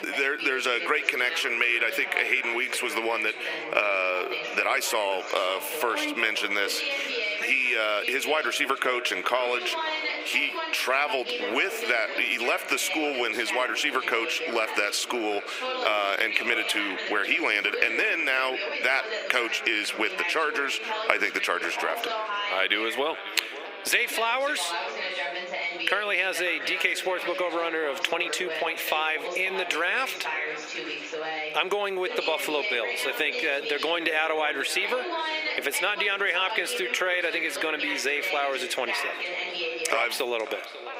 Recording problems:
echo of what is said; strong; throughout; 540 ms later, 10 dB below the speech
squashed, flat; heavily, background pumping
thin; somewhat; fading below 350 Hz
background chatter; loud; throughout; 2 voices, 8 dB below the speech

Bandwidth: 15.5 kHz